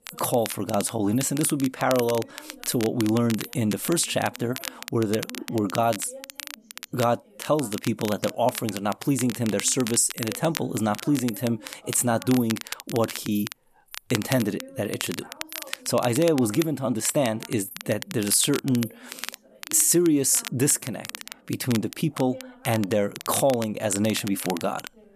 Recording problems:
crackle, like an old record; noticeable; 10 dB below the speech
animal sounds; faint; throughout; 25 dB below the speech
voice in the background; faint; throughout; 25 dB below the speech

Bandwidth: 14.5 kHz